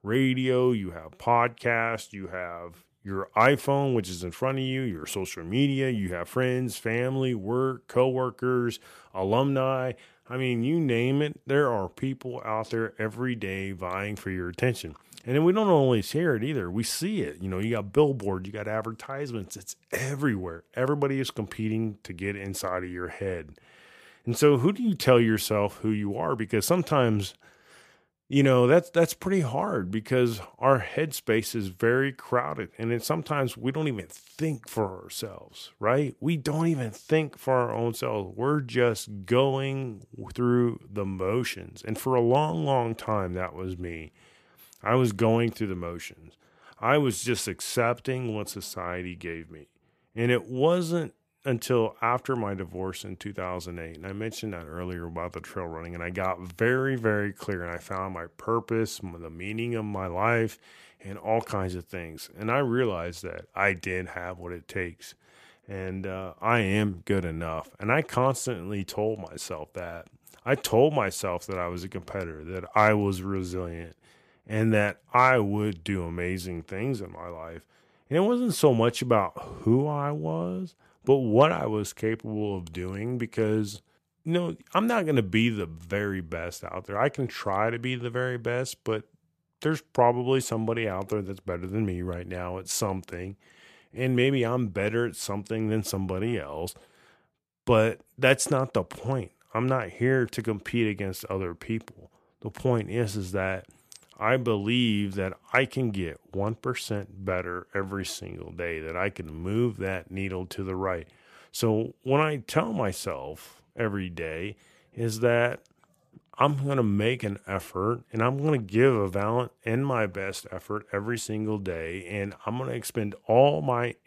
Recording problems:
none

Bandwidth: 14.5 kHz